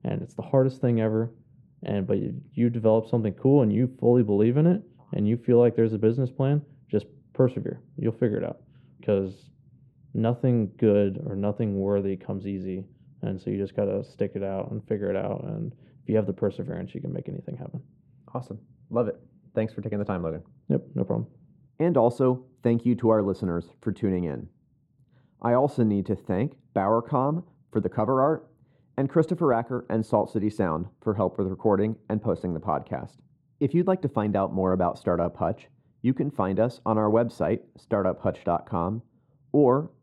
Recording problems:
muffled; very; fading above 1.5 kHz

